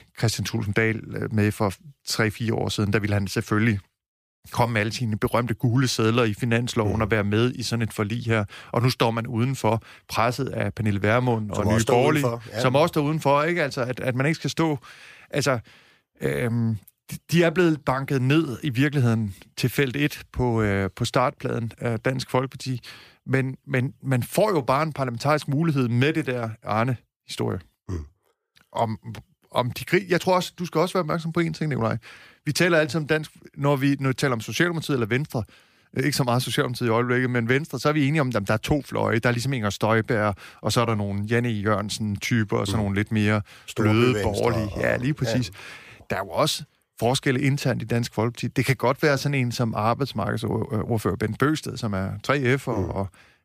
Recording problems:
none

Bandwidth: 15 kHz